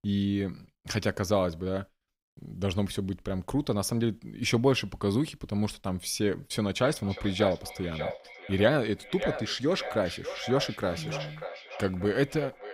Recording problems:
echo of what is said; strong; from 6.5 s on; 590 ms later, 10 dB below the speech

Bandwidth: 15.5 kHz